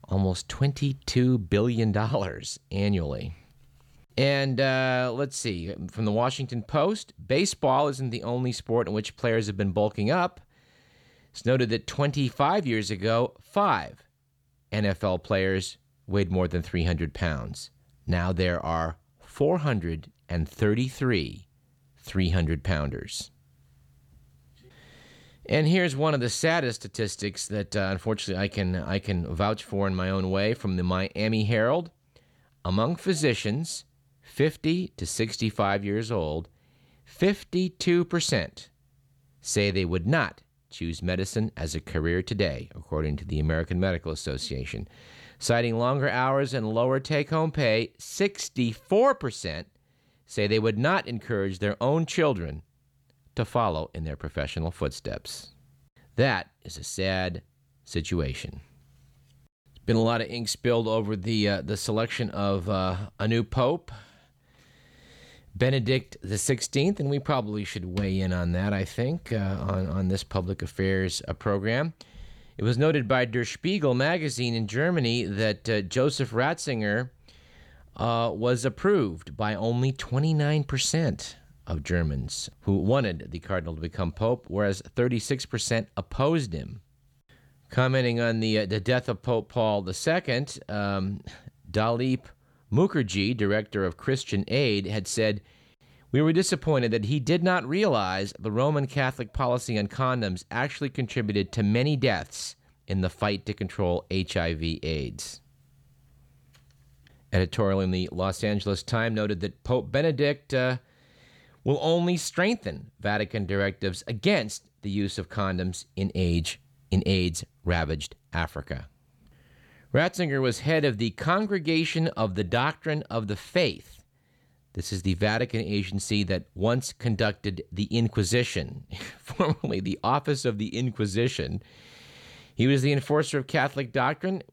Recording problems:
none

